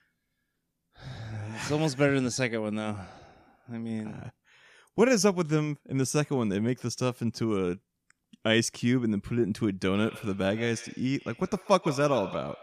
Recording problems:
echo of what is said; noticeable; from 10 s on; 130 ms later, 15 dB below the speech

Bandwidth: 14.5 kHz